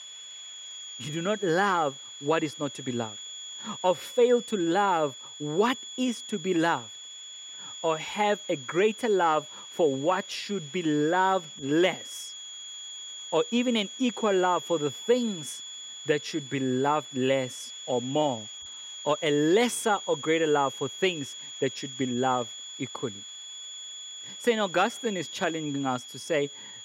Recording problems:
high-pitched whine; noticeable; throughout; 3.5 kHz, 10 dB below the speech
hiss; faint; throughout; 30 dB below the speech

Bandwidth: 16 kHz